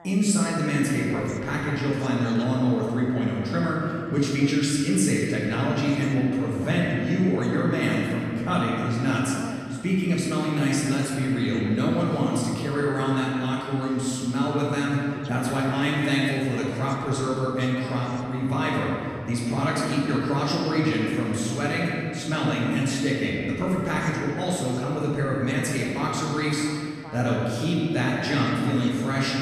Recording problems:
room echo; strong; dies away in 2.3 s
off-mic speech; far
voice in the background; faint; throughout; 20 dB below the speech

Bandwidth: 14.5 kHz